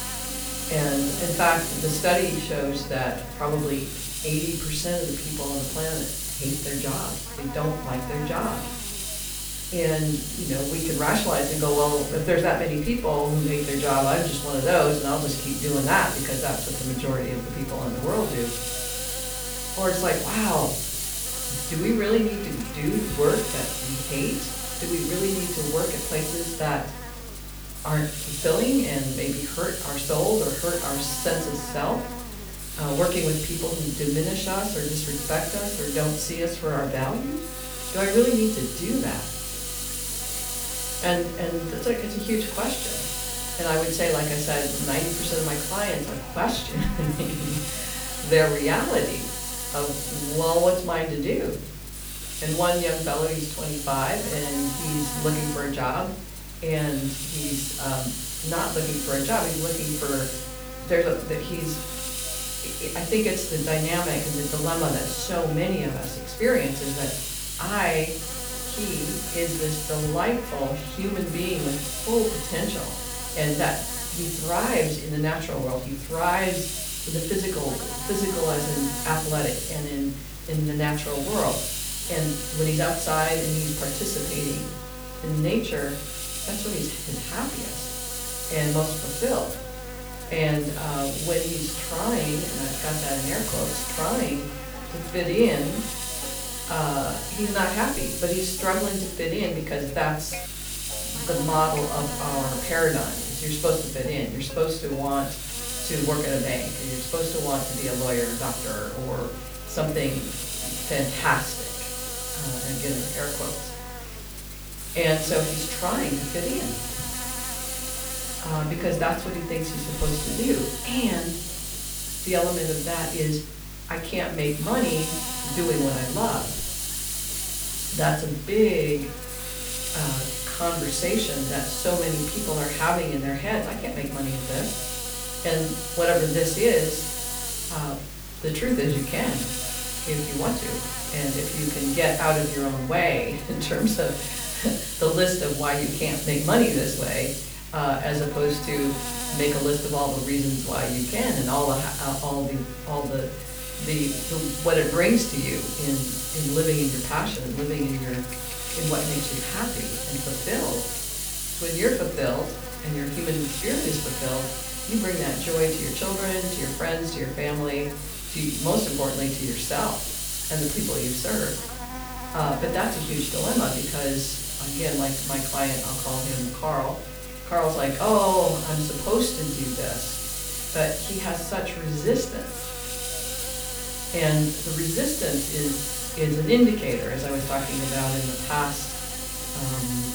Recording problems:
off-mic speech; far
room echo; slight; dies away in 0.4 s
hiss; loud; throughout; 4 dB below the speech
electrical hum; noticeable; throughout; 50 Hz, 15 dB below the speech
background music; faint; throughout; 25 dB below the speech
crackling; very faint; at 2:32 and from 2:41 to 2:43; 20 dB below the speech

